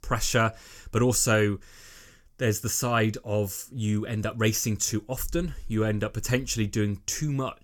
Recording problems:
none

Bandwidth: 18 kHz